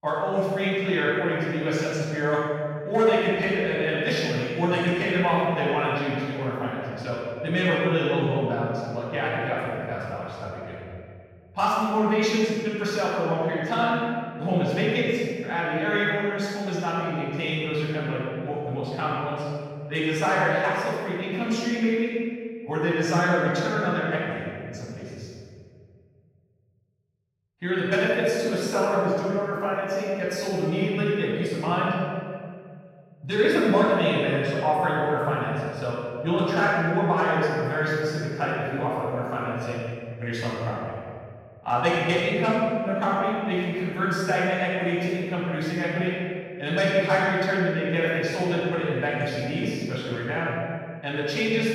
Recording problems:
room echo; strong; dies away in 1.9 s
off-mic speech; far

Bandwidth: 16.5 kHz